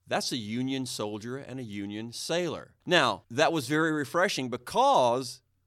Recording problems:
none

